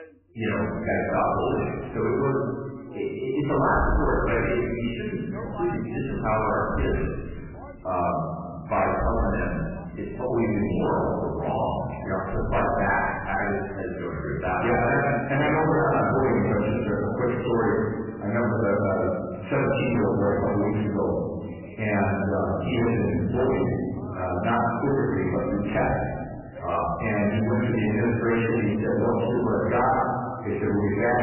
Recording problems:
off-mic speech; far
garbled, watery; badly; nothing above 3 kHz
room echo; noticeable; dies away in 1.4 s
distortion; slight; 11% of the sound clipped
crackling; noticeable; at 25 s; 15 dB below the speech
voice in the background; faint; throughout; 20 dB below the speech

